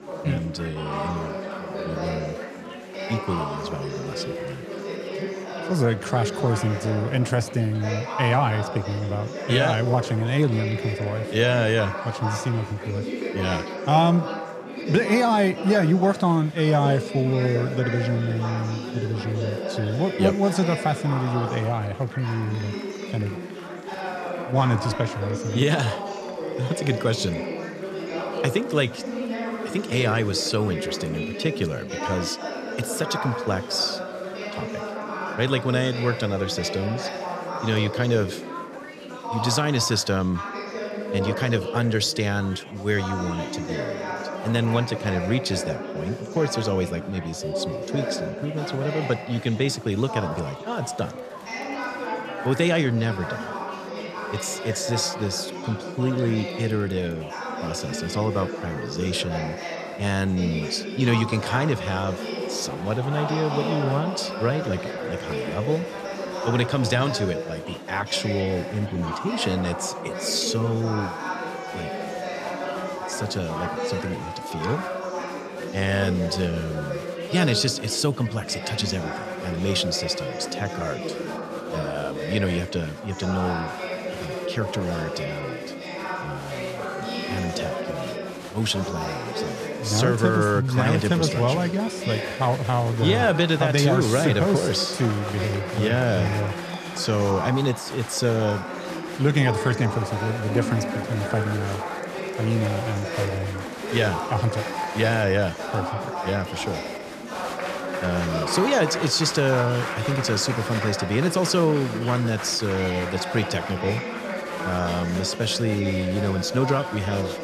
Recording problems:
chatter from many people; loud; throughout; 6 dB below the speech

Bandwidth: 14 kHz